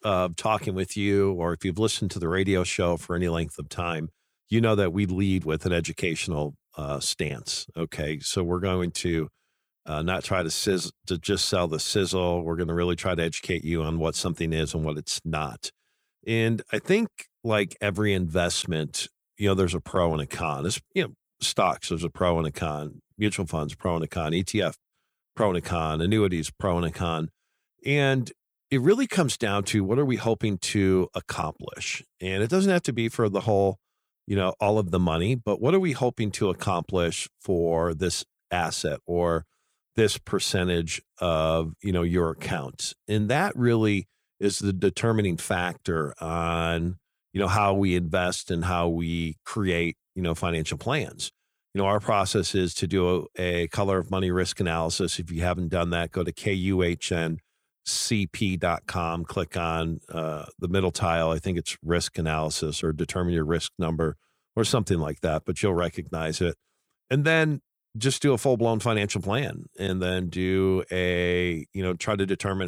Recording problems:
abrupt cut into speech; at the end

